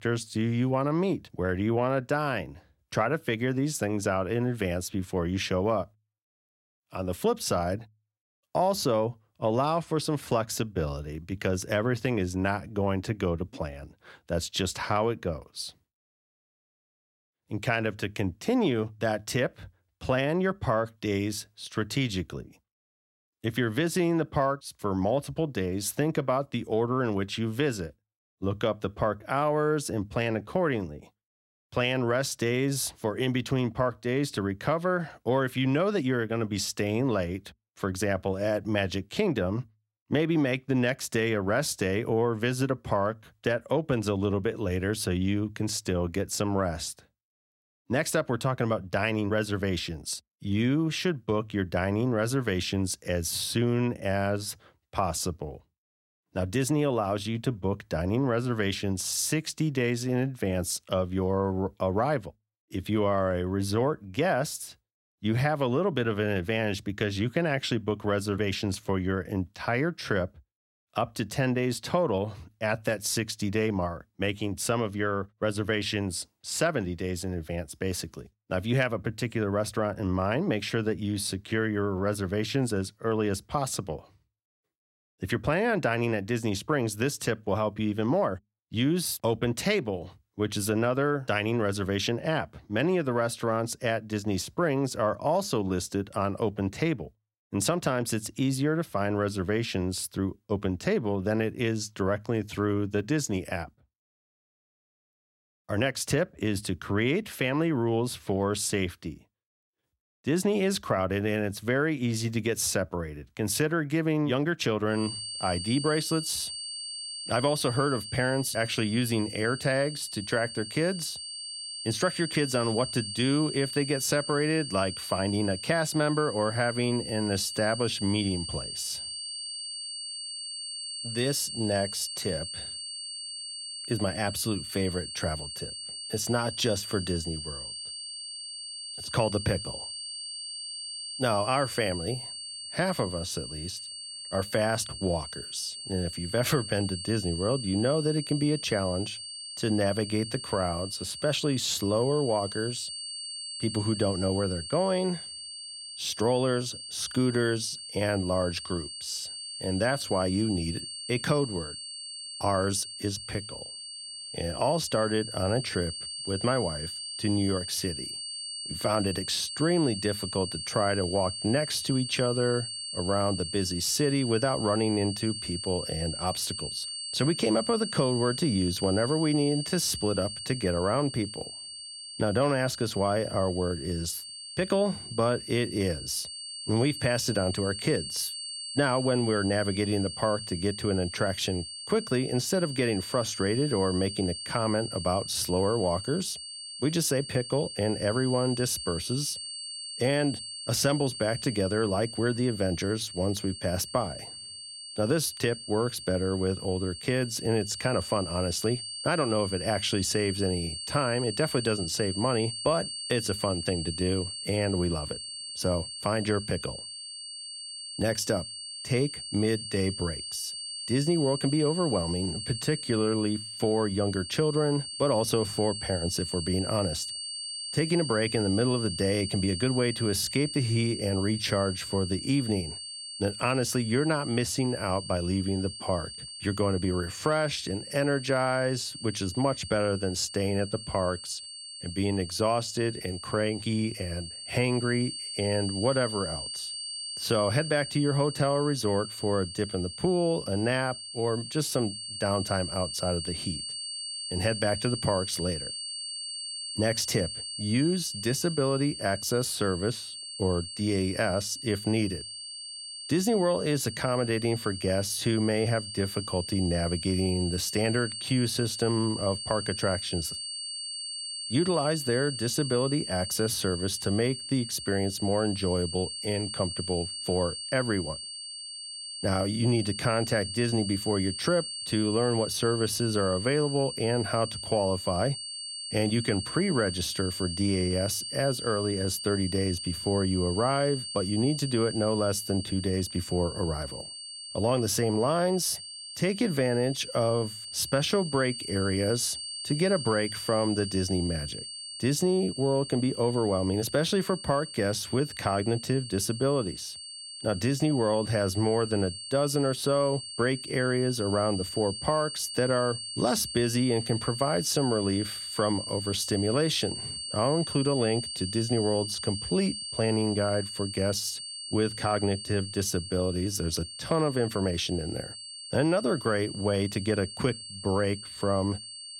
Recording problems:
high-pitched whine; loud; from 1:55 on; 4.5 kHz, 7 dB below the speech

